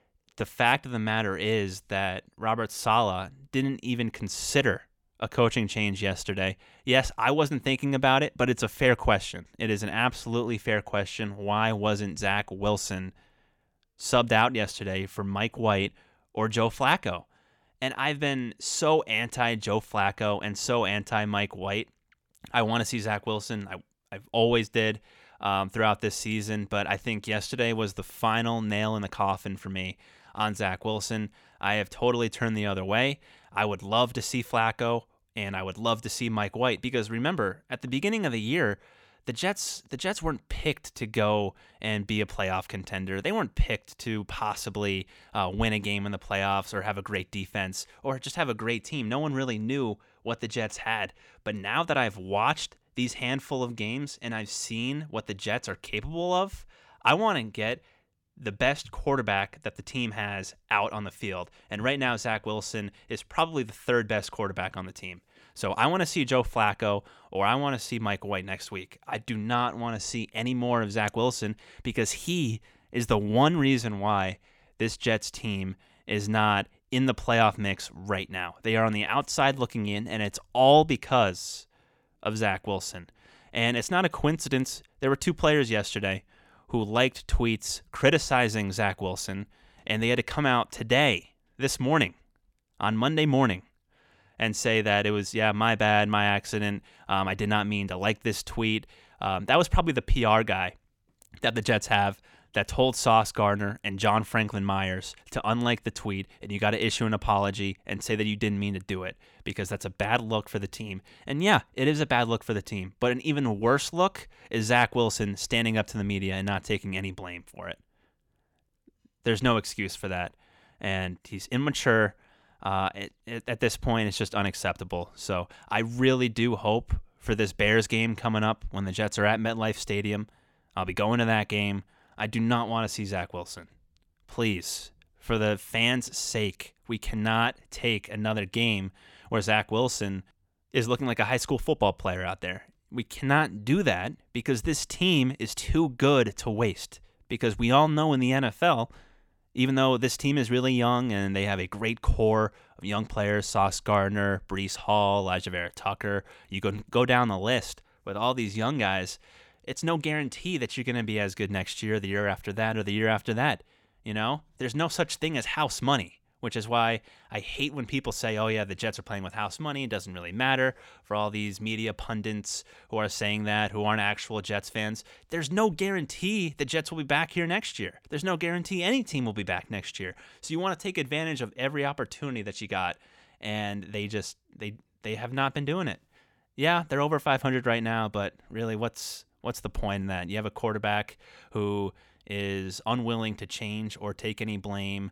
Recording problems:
none

